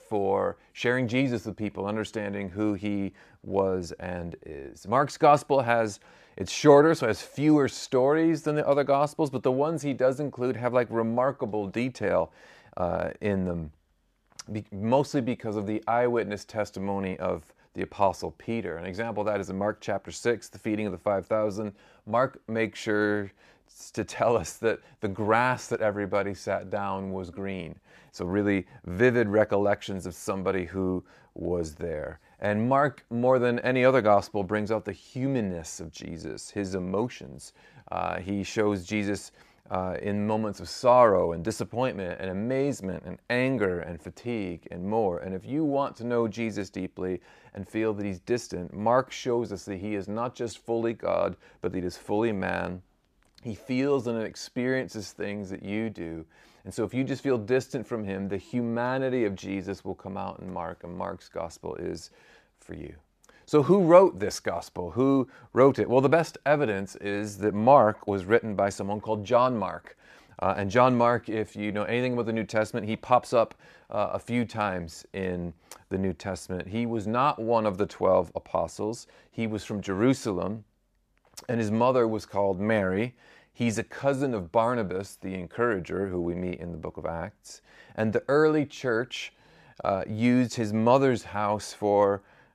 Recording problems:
none

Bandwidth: 14.5 kHz